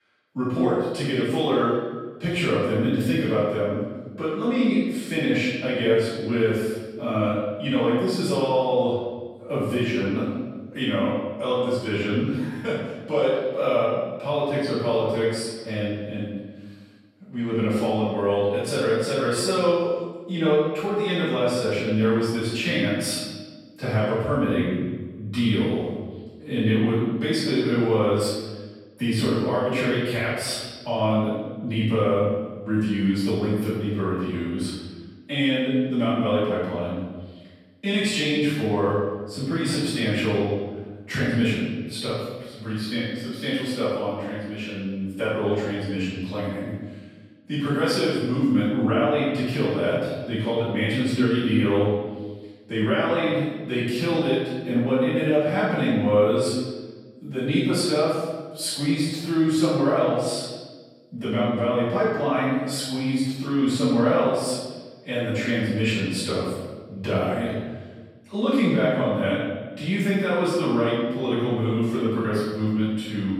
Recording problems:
room echo; strong; dies away in 1.3 s
off-mic speech; far

